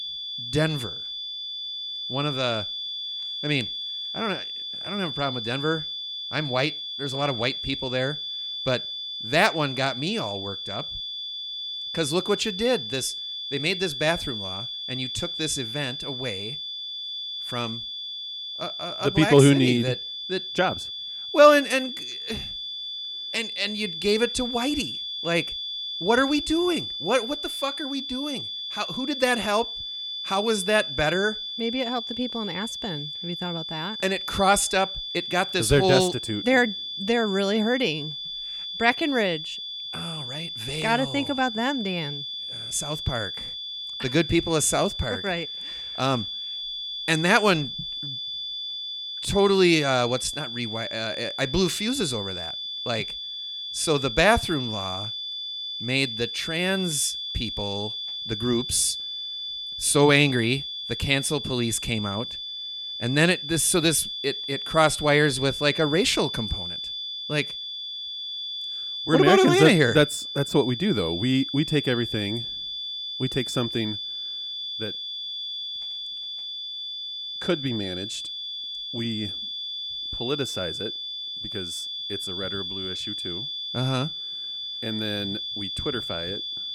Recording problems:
high-pitched whine; loud; throughout; 3.5 kHz, 6 dB below the speech

